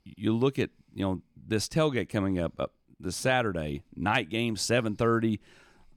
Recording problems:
none

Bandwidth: 18 kHz